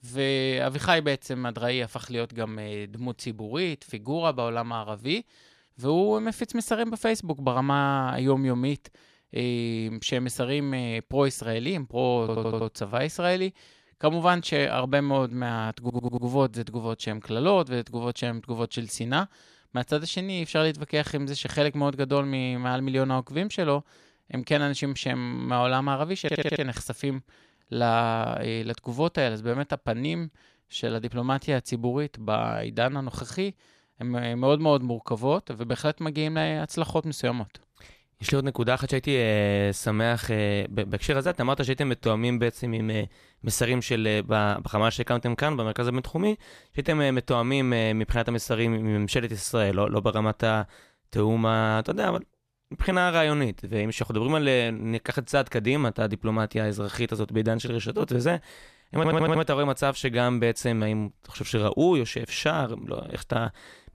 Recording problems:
audio stuttering; 4 times, first at 12 s

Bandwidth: 14.5 kHz